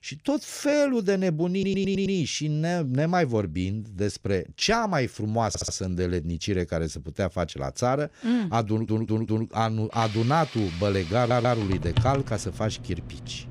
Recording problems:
household noises; loud; from 10 s on; 9 dB below the speech
audio stuttering; 4 times, first at 1.5 s

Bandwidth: 15 kHz